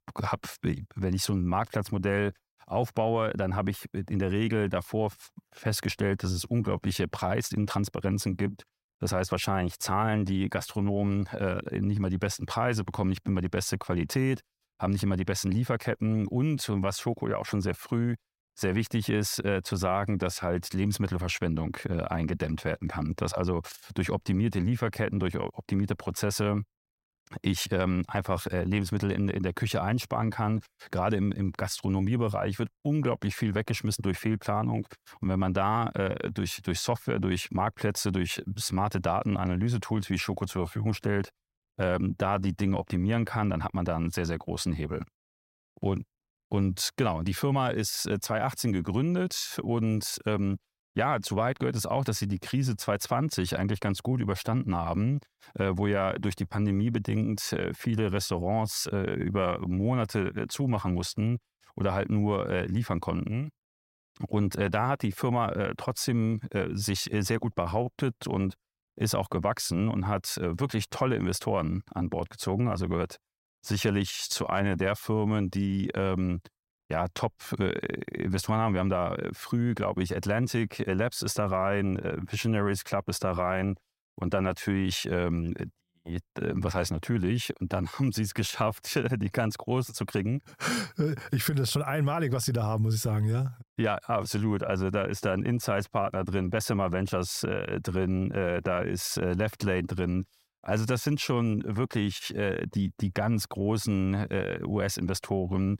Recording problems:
none

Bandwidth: 16 kHz